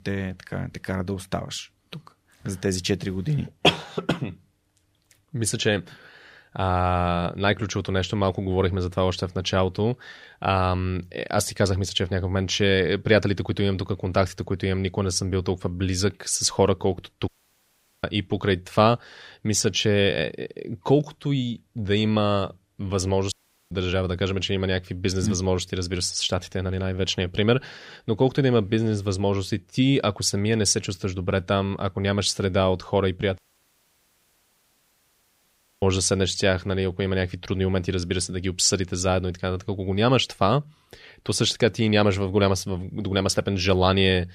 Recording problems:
audio cutting out; at 17 s for 1 s, at 23 s and at 33 s for 2.5 s

